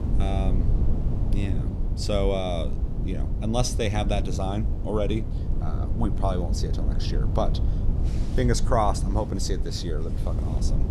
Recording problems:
wind noise on the microphone; occasional gusts; 10 dB below the speech

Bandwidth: 15 kHz